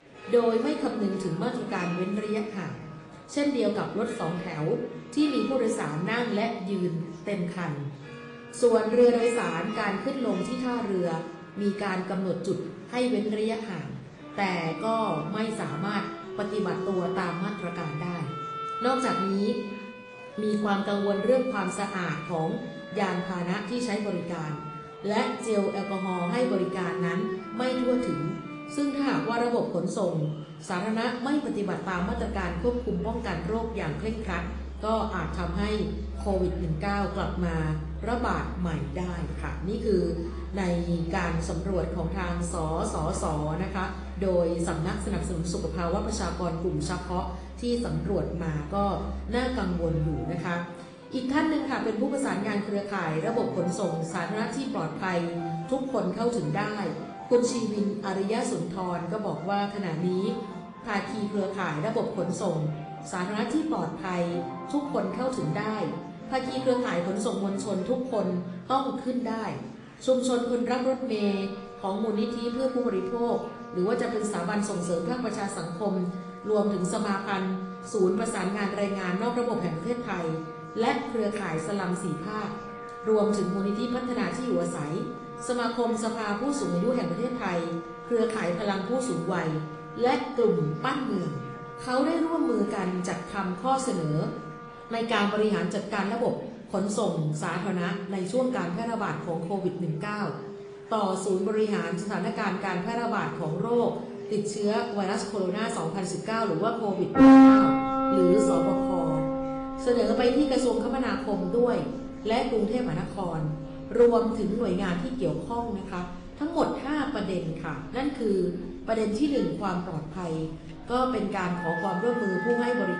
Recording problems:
room echo; slight; dies away in 0.7 s
distortion; slight; 0.2% of the sound clipped
off-mic speech; somewhat distant
garbled, watery; slightly
background music; loud; throughout; 5 dB below the speech
murmuring crowd; faint; throughout; 25 dB below the speech

